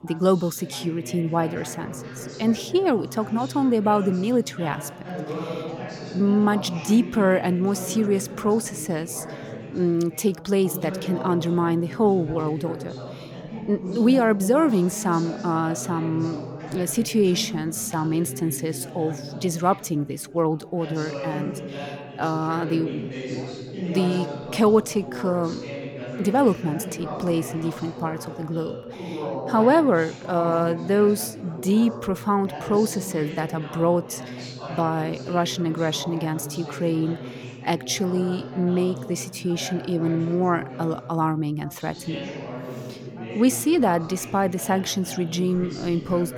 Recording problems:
background chatter; noticeable; throughout; 4 voices, 10 dB below the speech

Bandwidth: 17 kHz